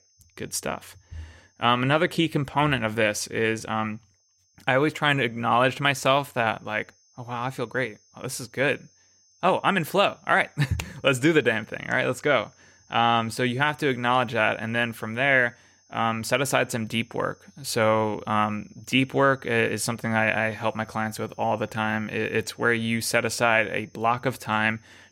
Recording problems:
high-pitched whine; faint; throughout; 6 kHz, 35 dB below the speech

